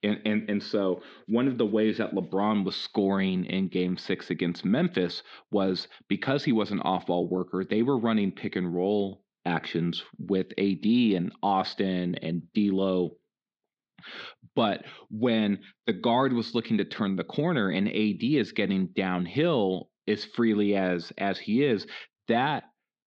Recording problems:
muffled; slightly; fading above 4 kHz

